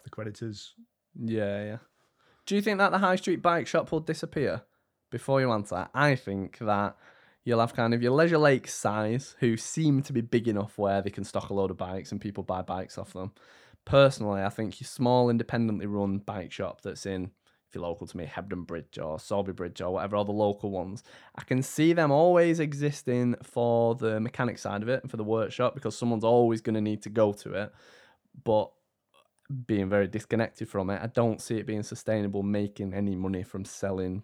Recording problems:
none

